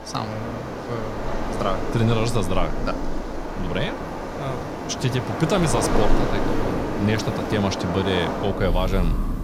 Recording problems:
rain or running water; loud; throughout; 2 dB below the speech

